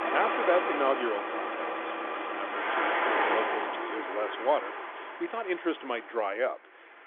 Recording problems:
phone-call audio; nothing above 3.5 kHz
traffic noise; very loud; throughout; 1 dB above the speech

